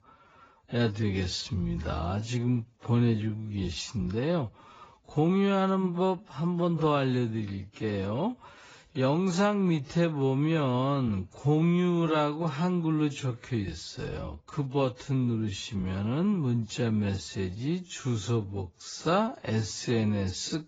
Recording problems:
garbled, watery; badly; nothing above 7.5 kHz
wrong speed, natural pitch; too slow; 0.6 times normal speed

